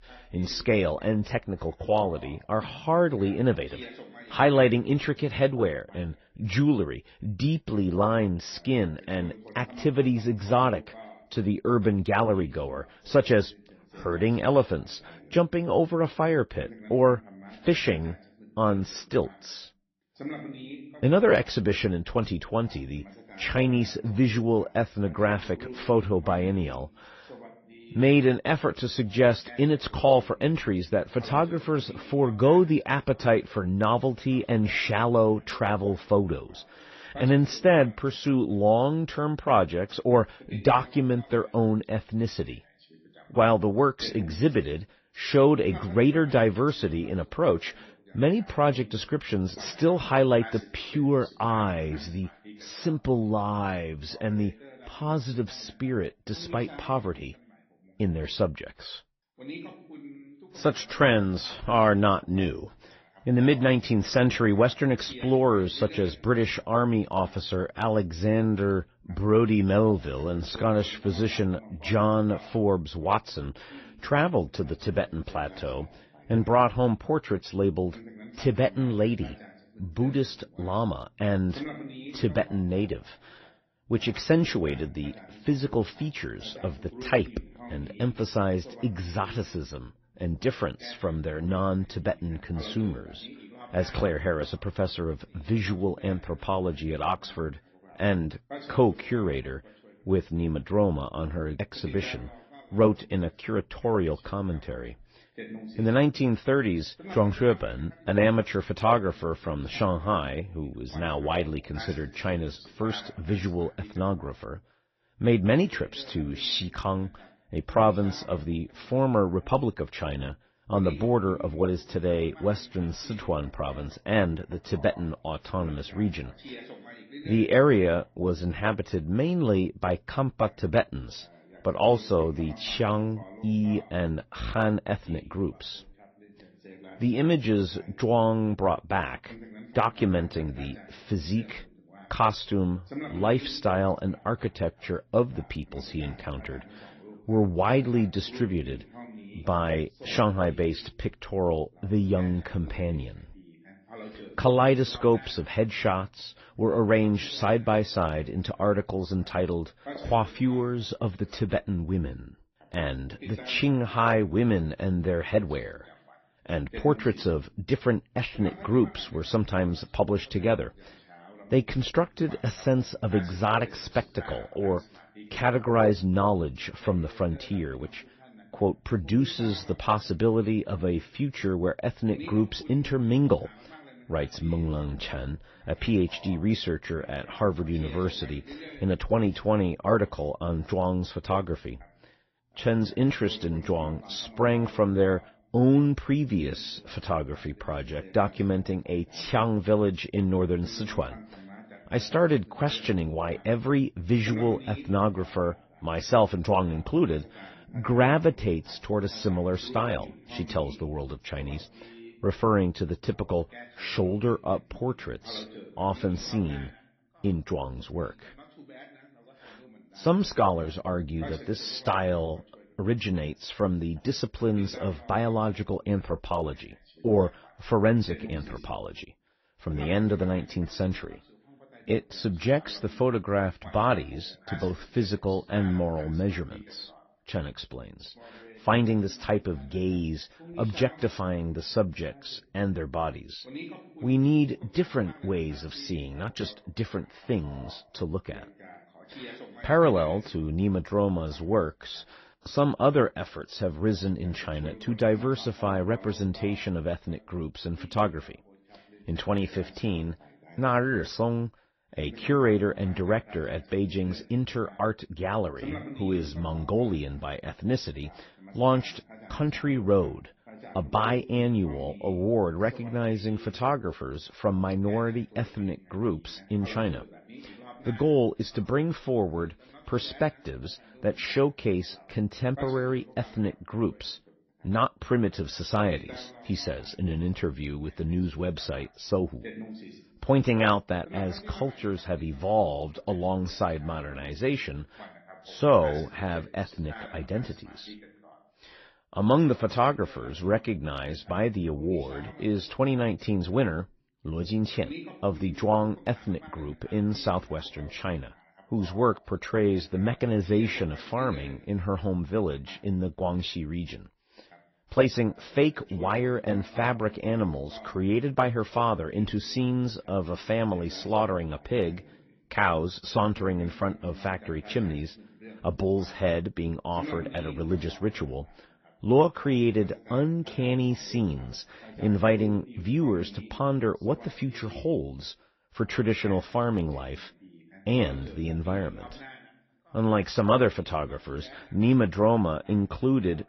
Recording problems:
garbled, watery; slightly; nothing above 6 kHz
voice in the background; faint; throughout; 20 dB below the speech

